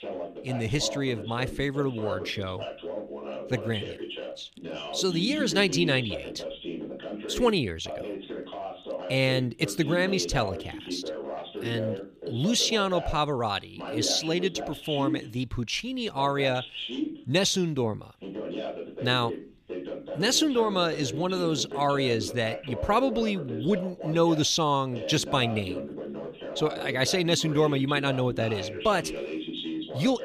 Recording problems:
voice in the background; loud; throughout; 9 dB below the speech

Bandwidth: 15 kHz